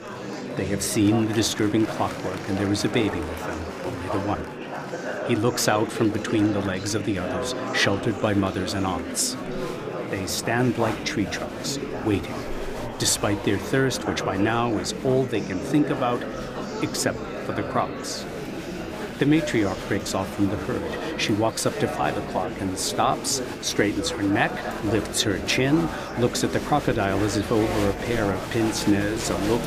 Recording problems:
murmuring crowd; loud; throughout; 6 dB below the speech

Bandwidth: 15 kHz